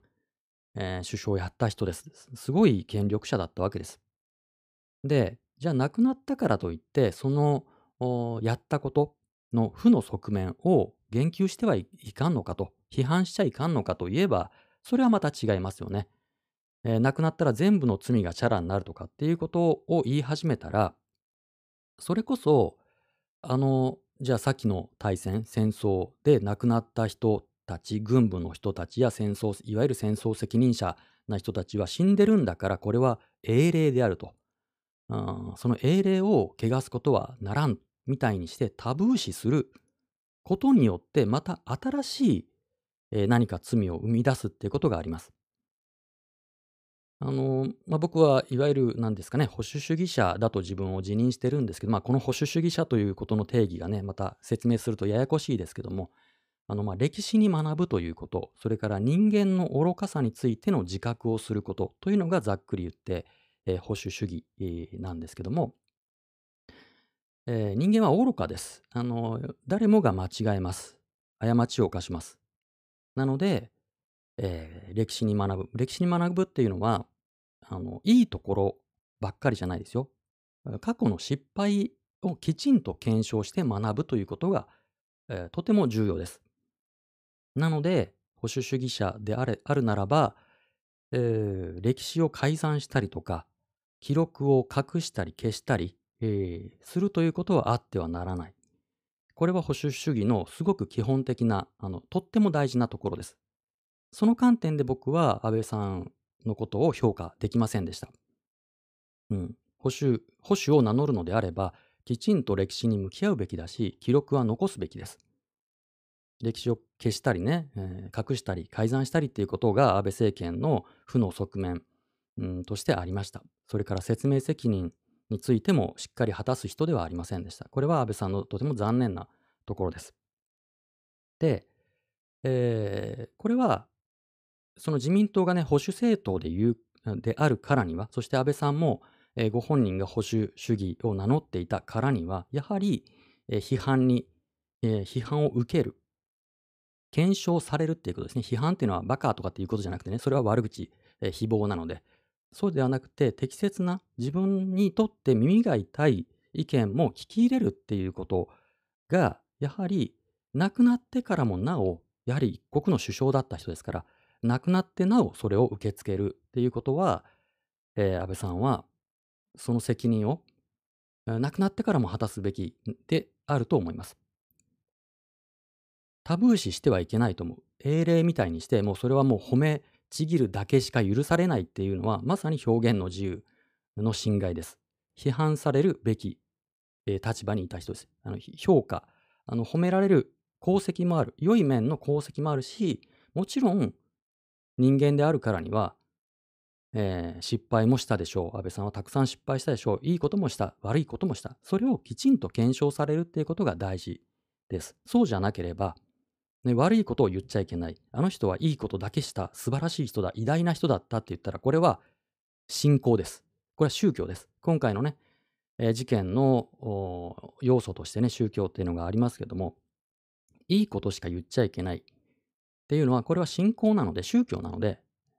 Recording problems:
none

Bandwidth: 15 kHz